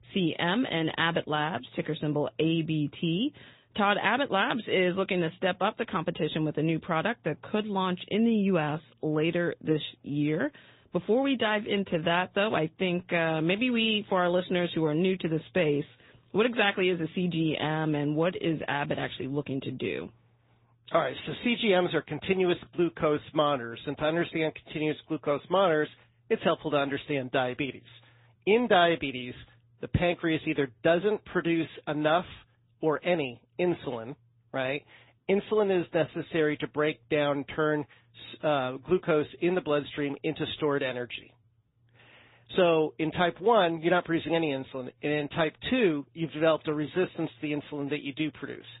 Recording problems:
high frequencies cut off; severe; nothing above 4 kHz
garbled, watery; slightly

